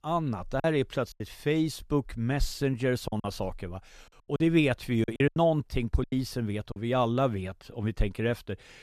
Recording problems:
choppy; very; from 0.5 to 3 s and from 4 to 7 s; 10% of the speech affected

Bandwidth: 14 kHz